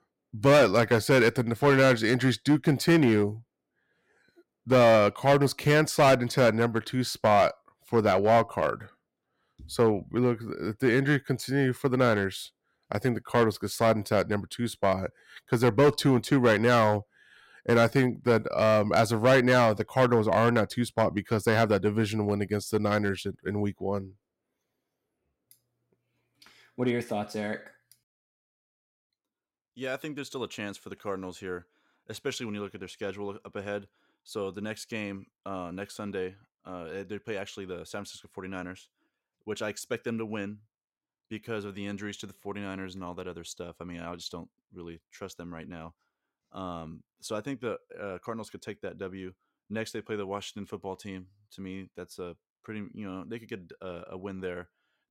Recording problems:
distortion; slight; 2% of the sound clipped

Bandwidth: 16 kHz